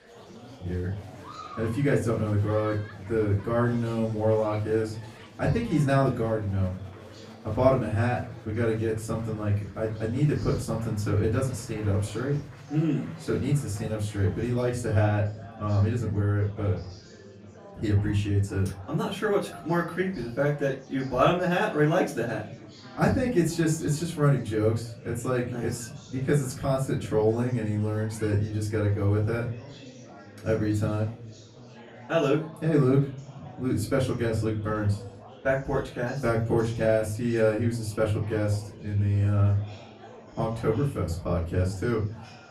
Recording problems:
off-mic speech; far
room echo; slight; dies away in 0.3 s
murmuring crowd; noticeable; throughout; 20 dB below the speech

